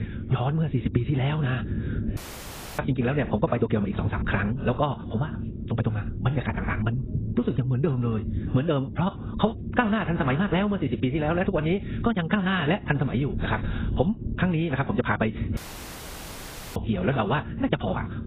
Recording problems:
garbled, watery; badly; nothing above 4 kHz
wrong speed, natural pitch; too fast; 1.7 times normal speed
squashed, flat; somewhat
low rumble; noticeable; throughout; 15 dB below the speech
audio cutting out; at 2 s for 0.5 s and at 16 s for 1 s

